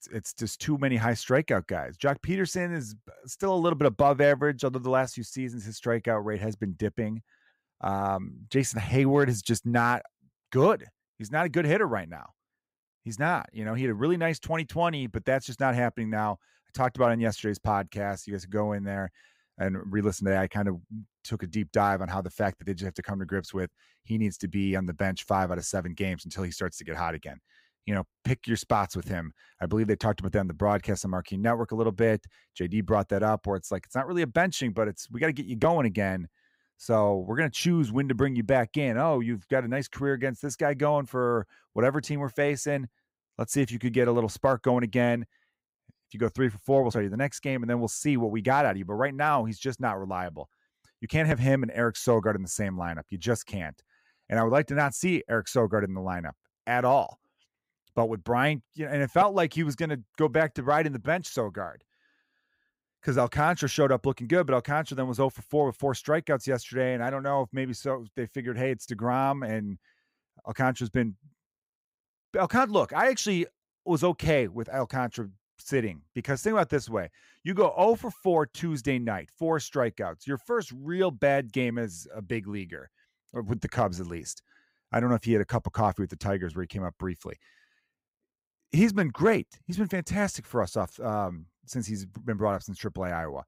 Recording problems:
none

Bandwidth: 15.5 kHz